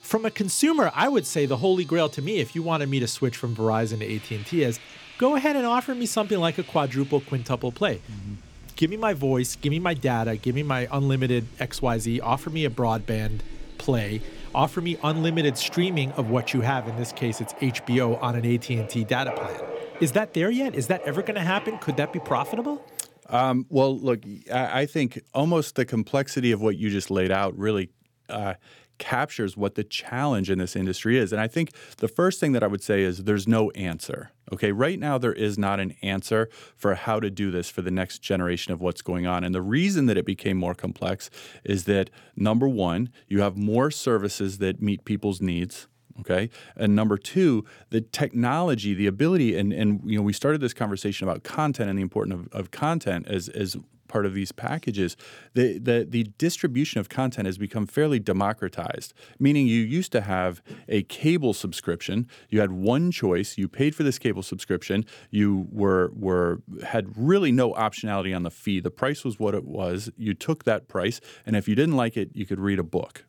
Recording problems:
household noises; noticeable; until 23 s; 15 dB below the speech

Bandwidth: 18.5 kHz